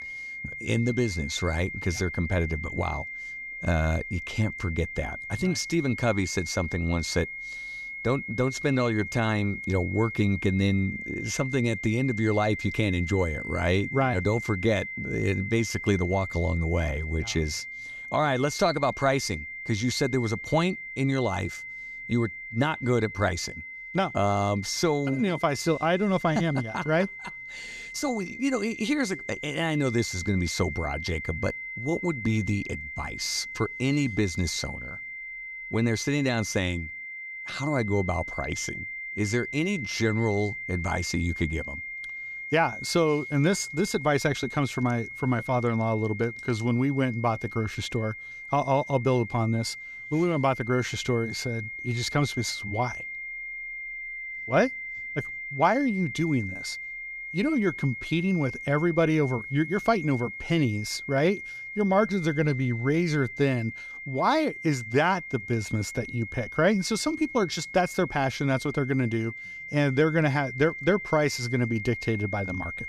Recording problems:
high-pitched whine; loud; throughout; 2 kHz, 8 dB below the speech

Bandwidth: 14.5 kHz